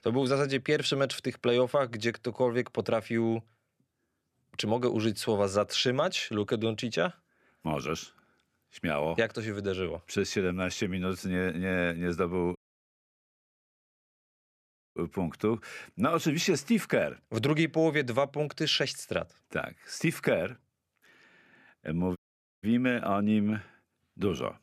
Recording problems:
audio cutting out; at 13 s for 2.5 s and at 22 s

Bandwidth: 14.5 kHz